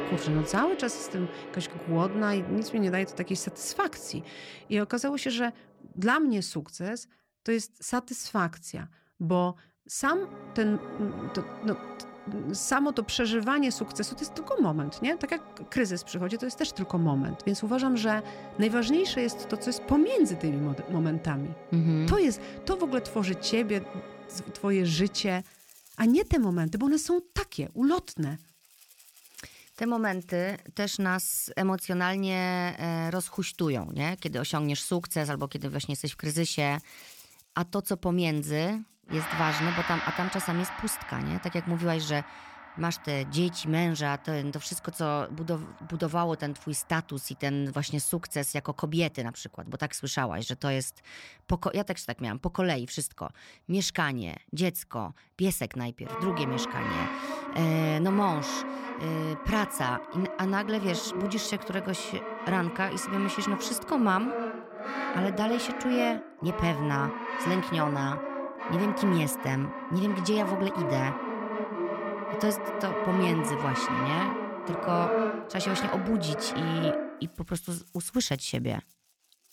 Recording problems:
background music; loud; throughout; 6 dB below the speech

